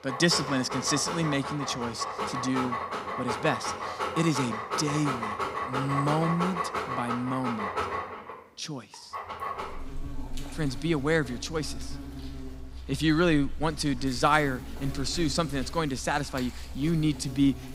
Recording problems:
animal sounds; loud; throughout; 6 dB below the speech

